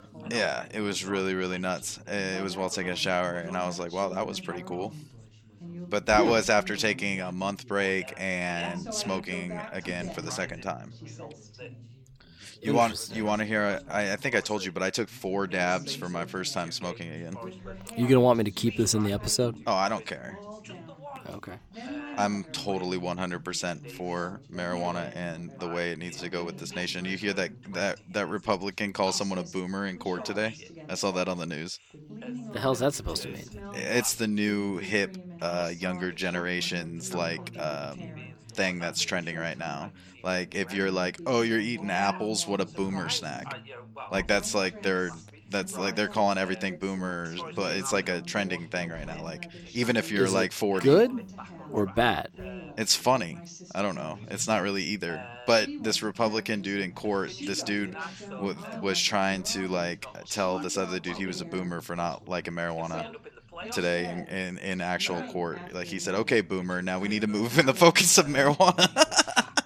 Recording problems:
background chatter; noticeable; throughout; 3 voices, 15 dB below the speech

